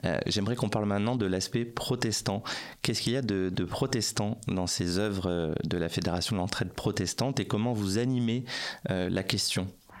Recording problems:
squashed, flat; heavily

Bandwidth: 16 kHz